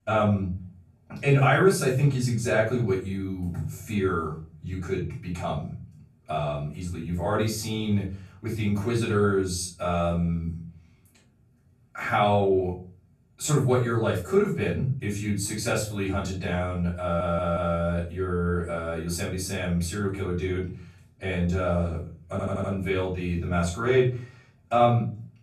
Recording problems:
off-mic speech; far
room echo; noticeable; dies away in 0.5 s
audio stuttering; at 17 s and at 22 s

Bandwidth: 13.5 kHz